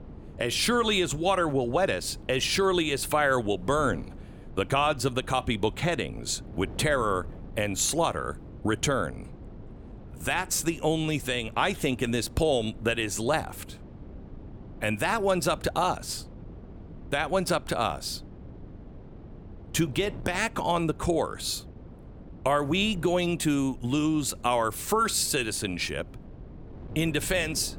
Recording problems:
wind noise on the microphone; occasional gusts; 25 dB below the speech

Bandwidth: 17 kHz